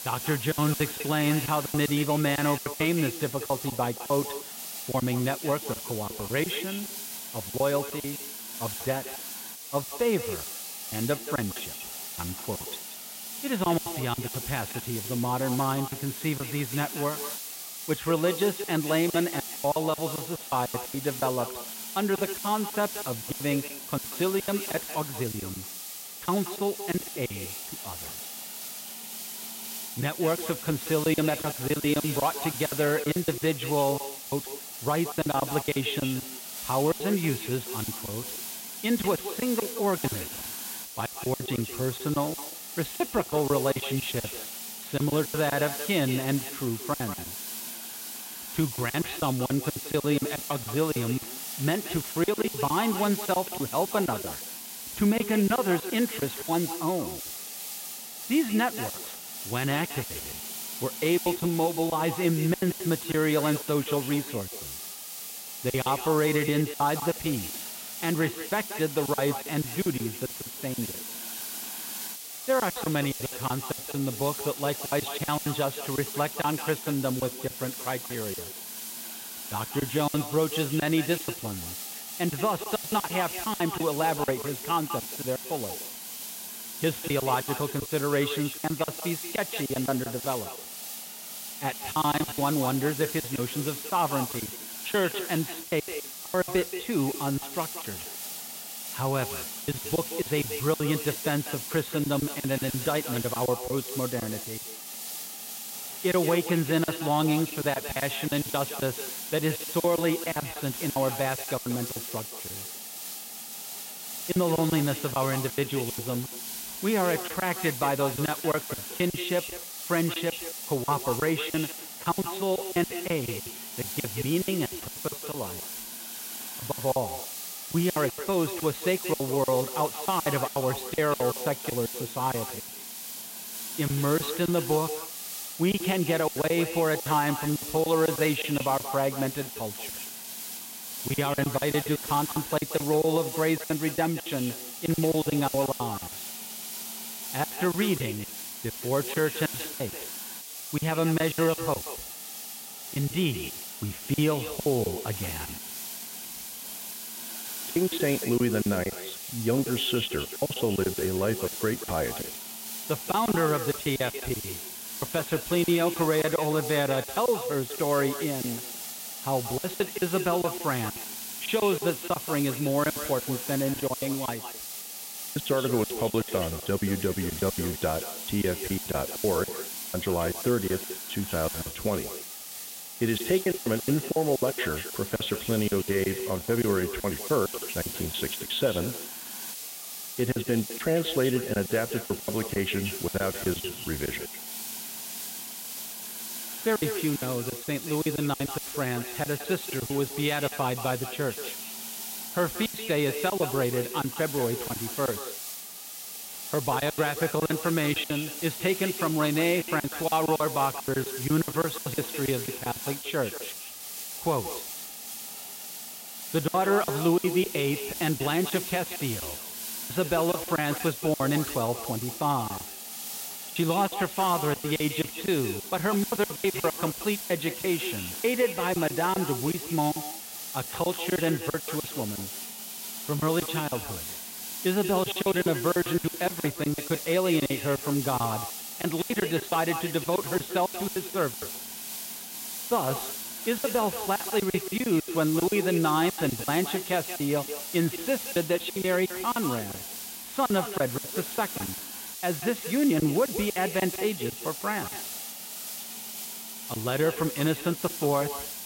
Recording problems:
echo of what is said; strong; throughout; 180 ms later, 10 dB below the speech
high frequencies cut off; severe; nothing above 4 kHz
hiss; loud; throughout; 6 dB below the speech
crackling; faint; from 51 to 52 s, from 1:33 to 1:34 and from 1:51 to 1:52; 30 dB below the speech
choppy; very; 14% of the speech affected

